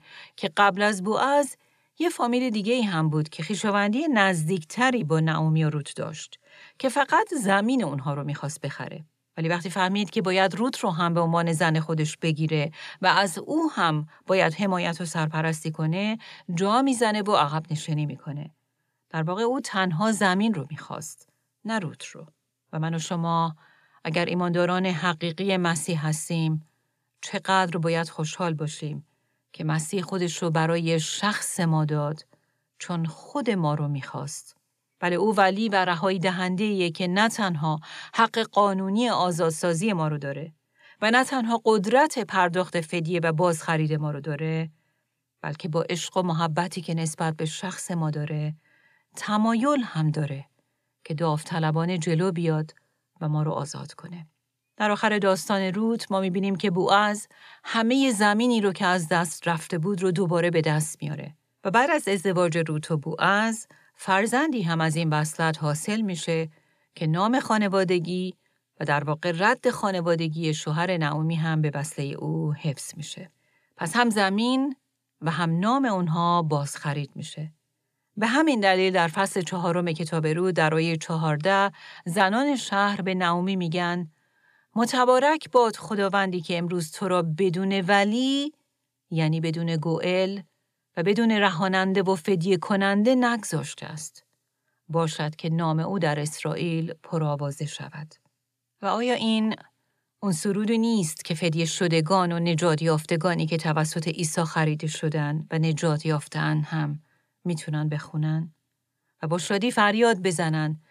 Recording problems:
none

